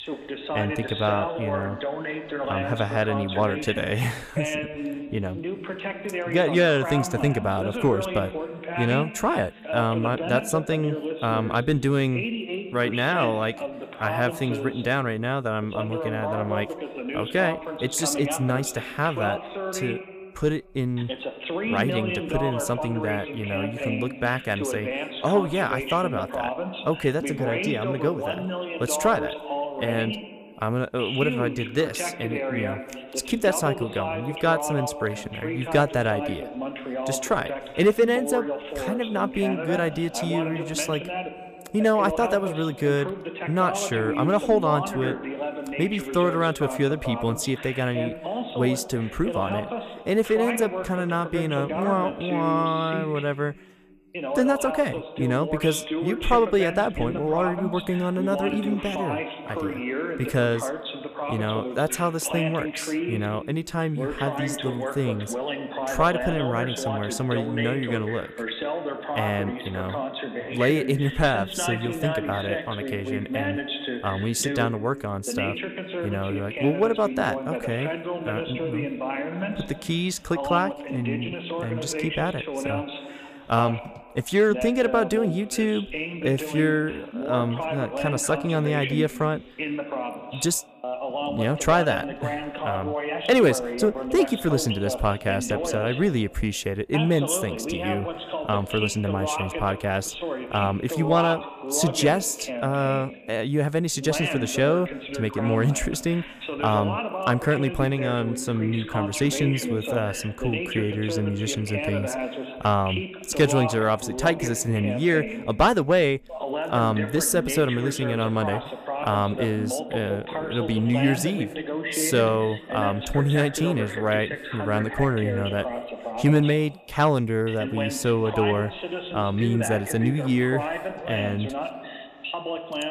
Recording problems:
voice in the background; loud; throughout; 6 dB below the speech

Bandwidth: 14.5 kHz